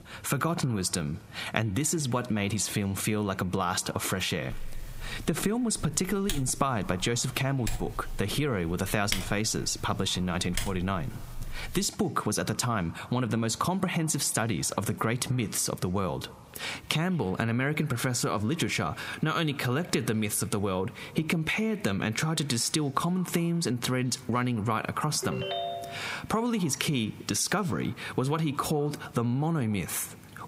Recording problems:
squashed, flat; heavily
echo of what is said; faint; throughout; 210 ms later, 25 dB below the speech
keyboard typing; noticeable; from 4.5 to 12 s; peak 4 dB below the speech
phone ringing; noticeable; at 25 s; peak 3 dB below the speech

